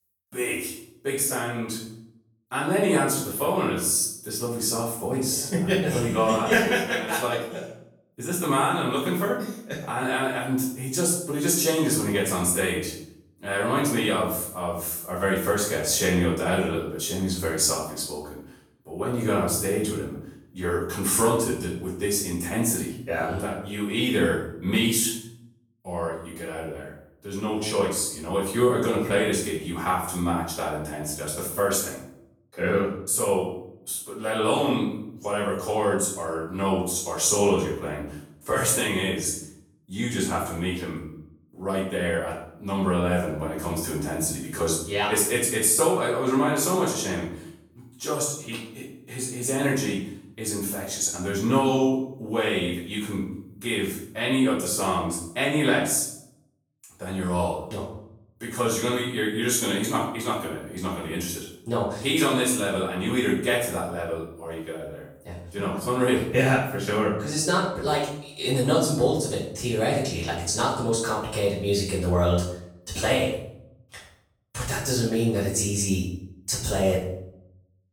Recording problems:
off-mic speech; far
room echo; noticeable; dies away in 0.6 s

